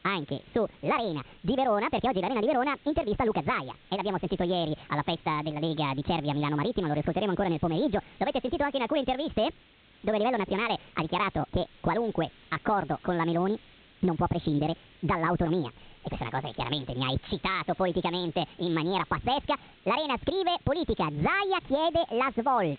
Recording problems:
high frequencies cut off; severe; nothing above 4 kHz
wrong speed and pitch; too fast and too high; 1.6 times normal speed
hiss; faint; throughout; 25 dB below the speech

